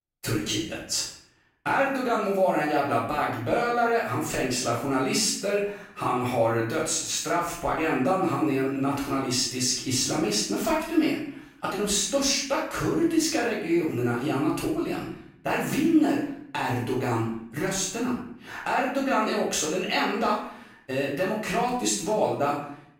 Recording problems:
off-mic speech; far
room echo; noticeable; dies away in 0.6 s

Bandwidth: 16 kHz